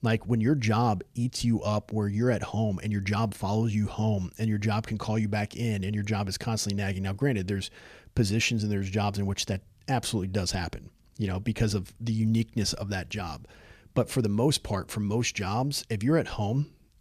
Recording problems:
none

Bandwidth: 14.5 kHz